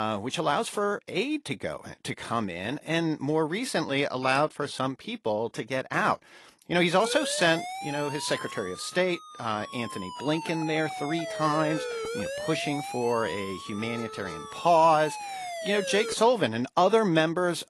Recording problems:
garbled, watery; slightly; nothing above 11 kHz
abrupt cut into speech; at the start
siren; noticeable; from 7 to 16 s; peak 5 dB below the speech

